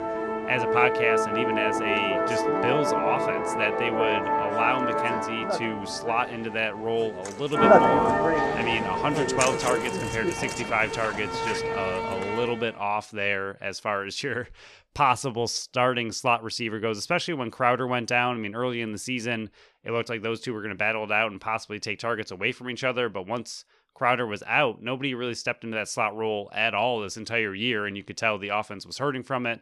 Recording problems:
background music; very loud; until 12 s; 2 dB above the speech

